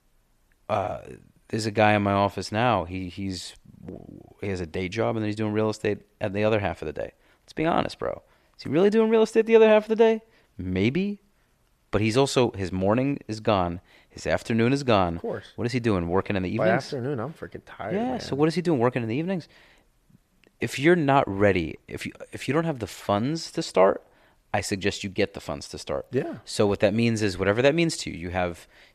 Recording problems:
none

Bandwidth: 14.5 kHz